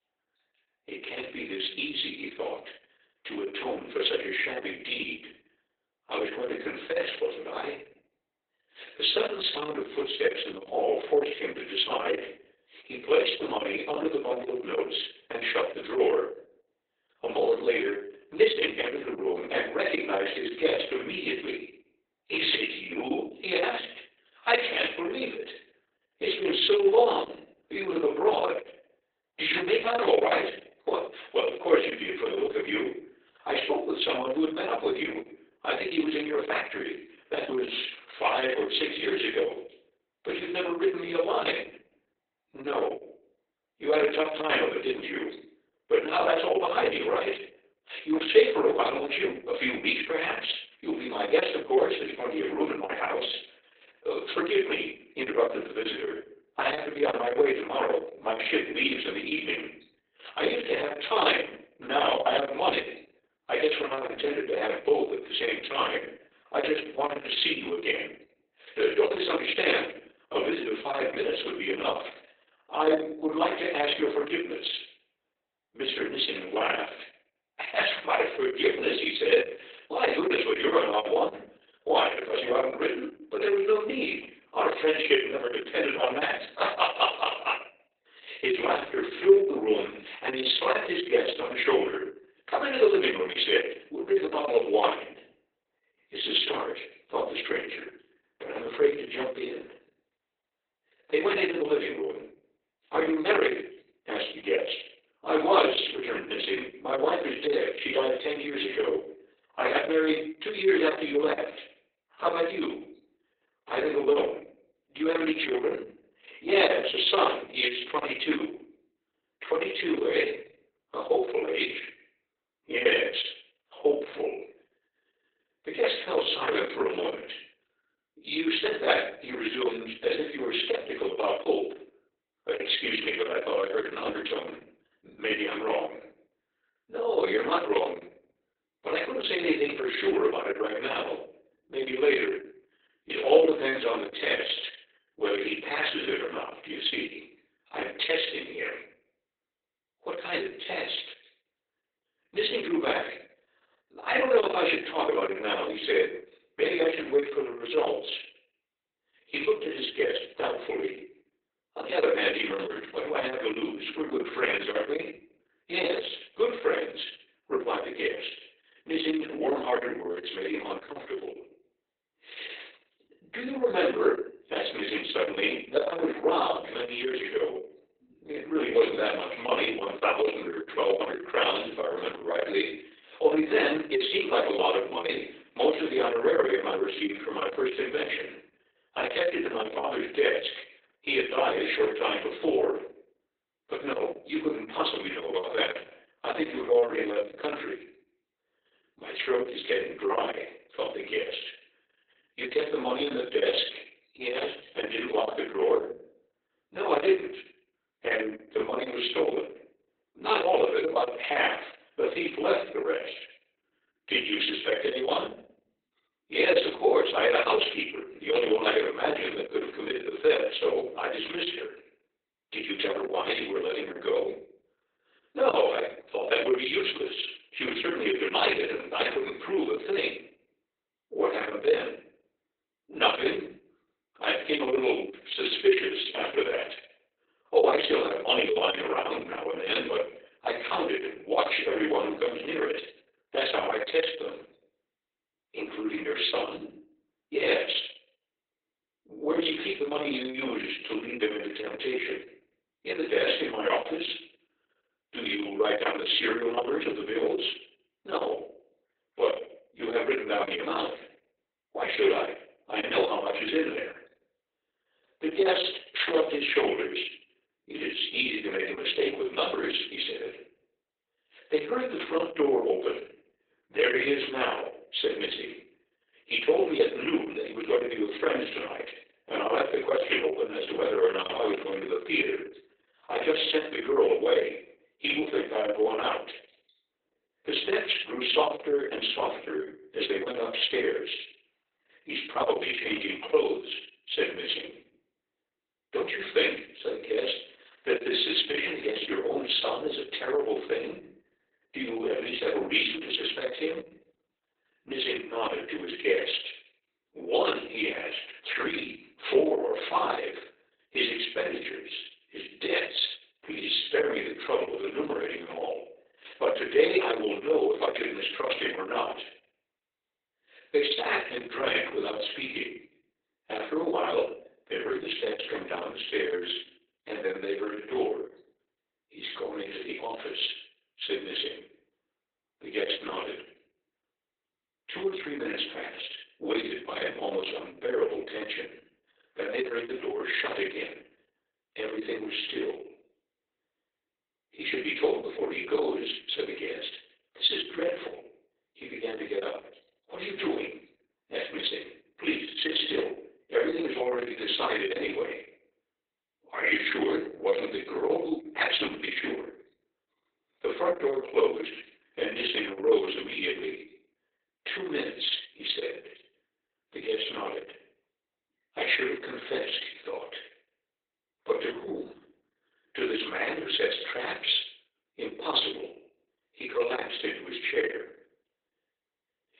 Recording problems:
off-mic speech; far
garbled, watery; badly; nothing above 4 kHz
thin; very; fading below 400 Hz
room echo; slight; dies away in 0.4 s

